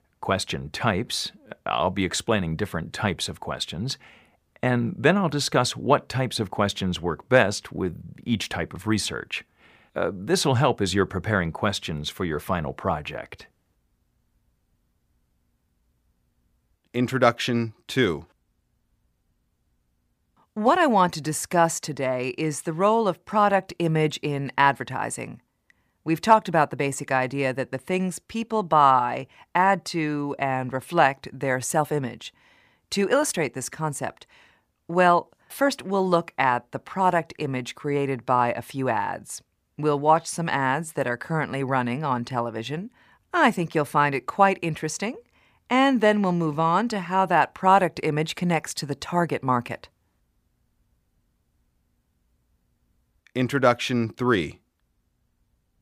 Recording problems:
none

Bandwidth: 15 kHz